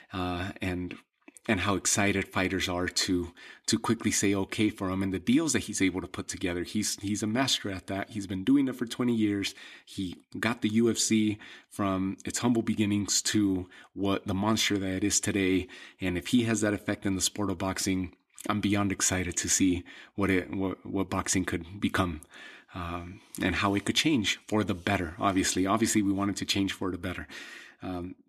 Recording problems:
none

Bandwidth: 14 kHz